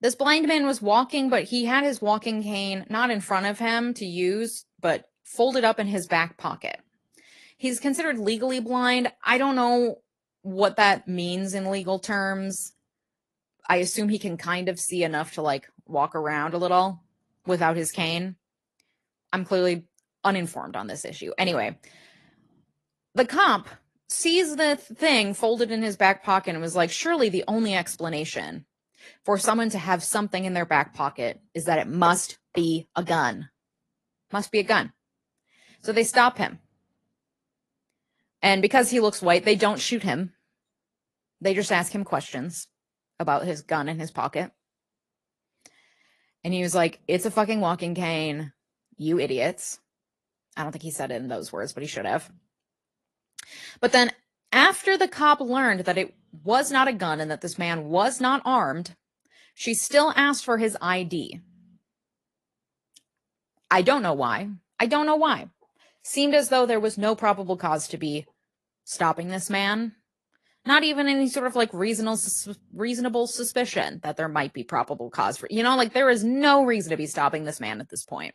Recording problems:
garbled, watery; slightly; nothing above 11.5 kHz

